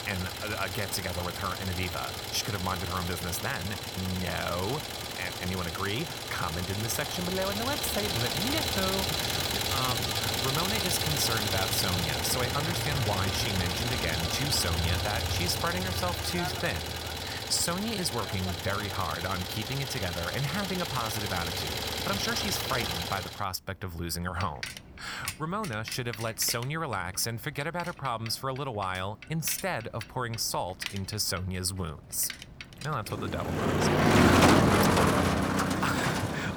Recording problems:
traffic noise; very loud; throughout; 3 dB above the speech
uneven, jittery; strongly; from 9.5 to 35 s

